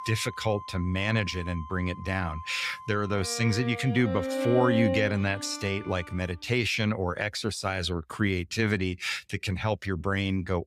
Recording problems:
background music; loud; until 5.5 s; 7 dB below the speech

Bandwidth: 15.5 kHz